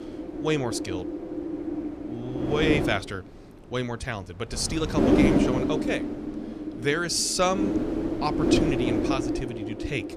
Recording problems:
wind noise on the microphone; heavy; 2 dB below the speech

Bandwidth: 13.5 kHz